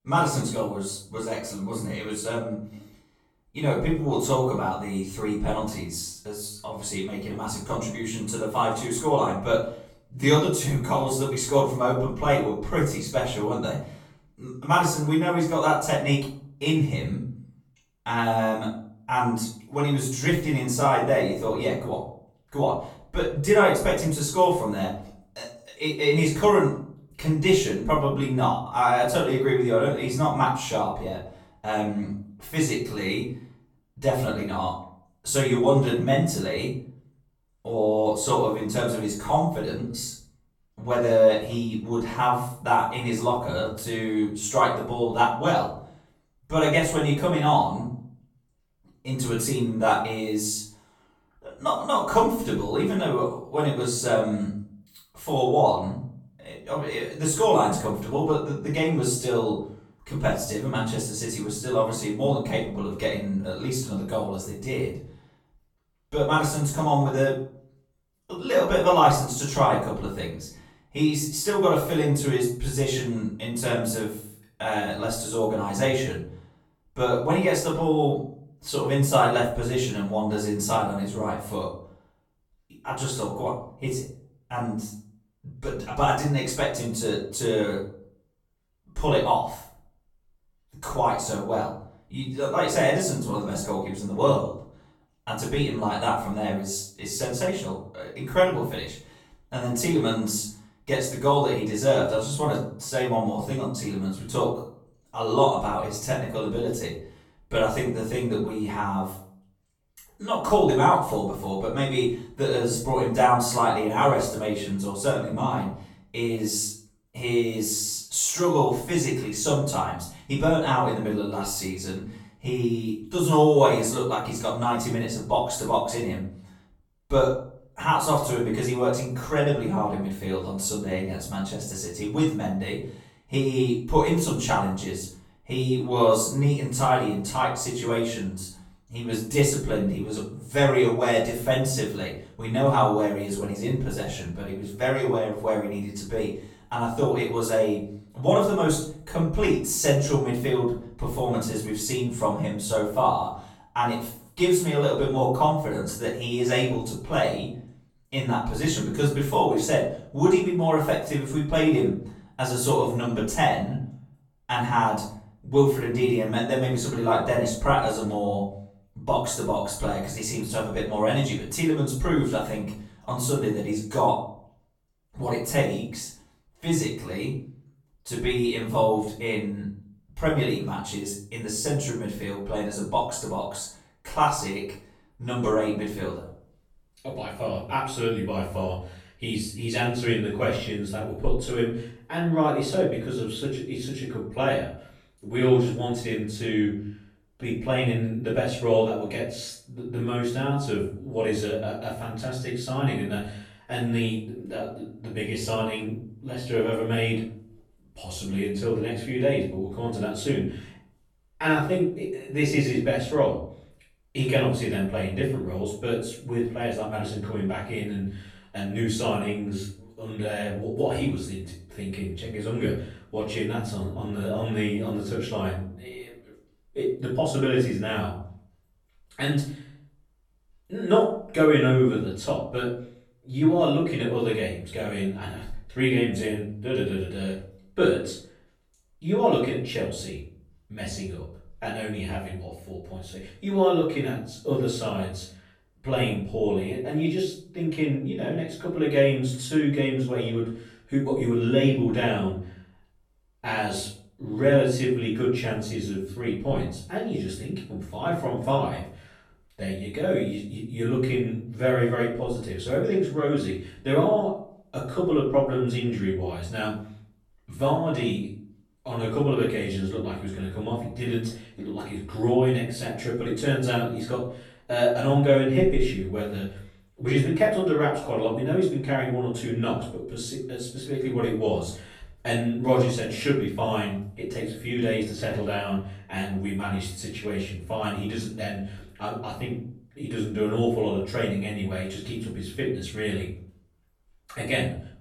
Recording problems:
off-mic speech; far
room echo; noticeable; dies away in 0.5 s

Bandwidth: 17.5 kHz